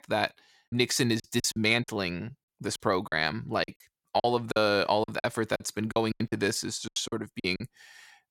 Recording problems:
choppy; very; 14% of the speech affected

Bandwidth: 17 kHz